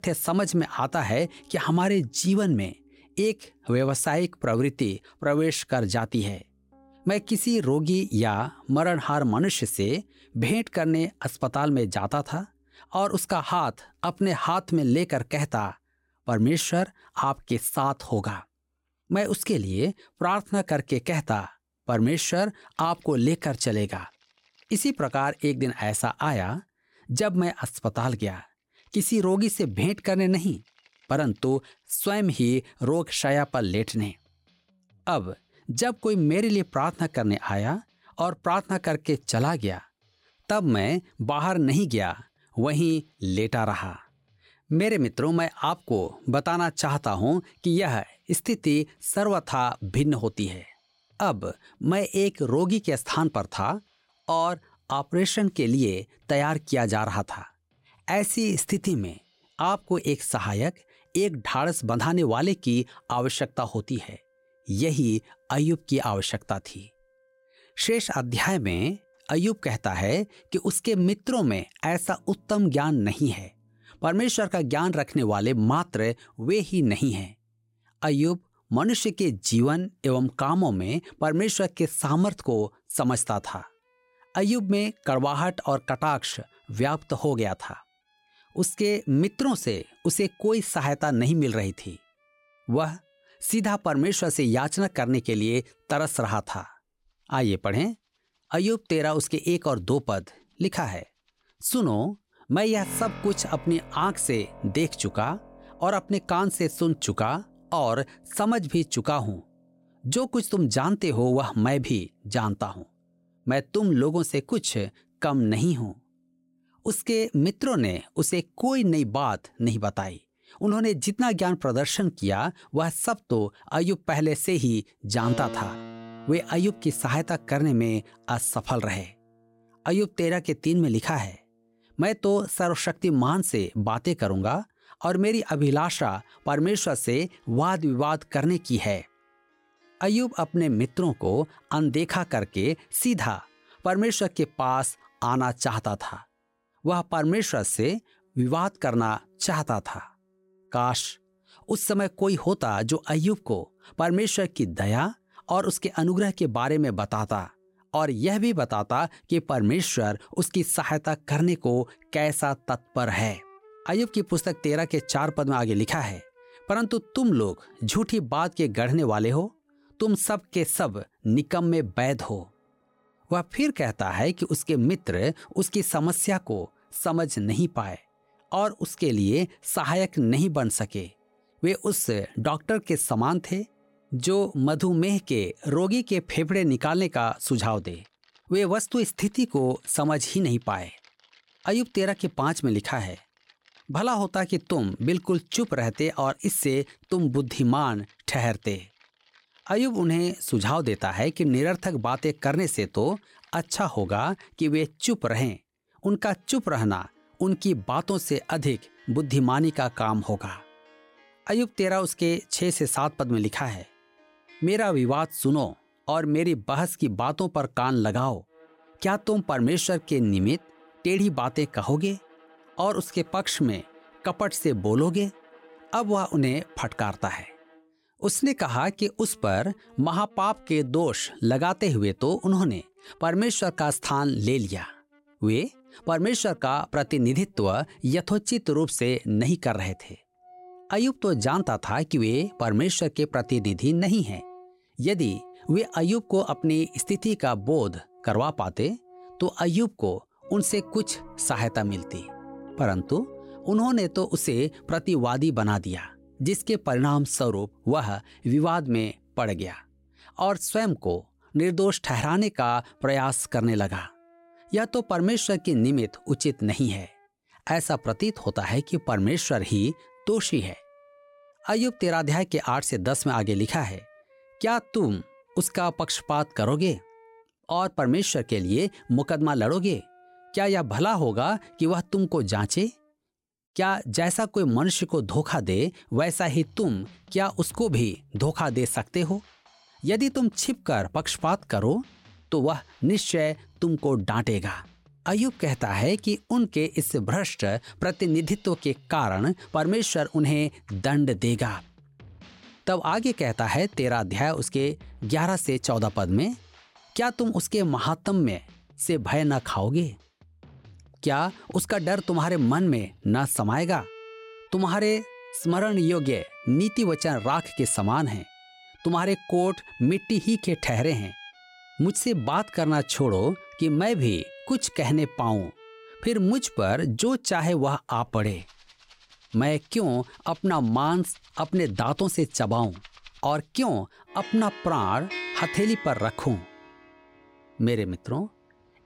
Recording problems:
background music; faint; throughout; 25 dB below the speech

